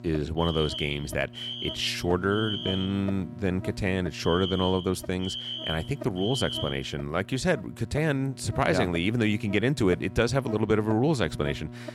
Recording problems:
electrical hum; noticeable; throughout; 60 Hz, 15 dB below the speech
alarm; noticeable; until 7 s; peak 4 dB below the speech

